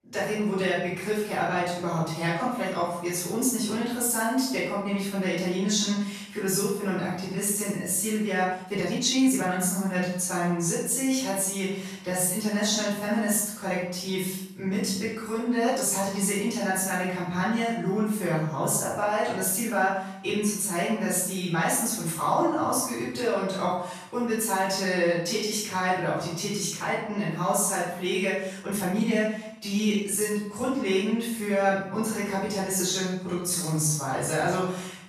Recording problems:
room echo; strong; dies away in 0.7 s
off-mic speech; far
uneven, jittery; strongly; from 7 to 34 s

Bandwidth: 14 kHz